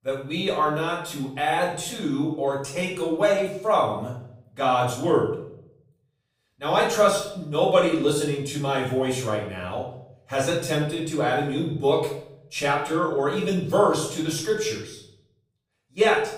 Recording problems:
off-mic speech; far
room echo; noticeable; dies away in 0.6 s

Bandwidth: 15.5 kHz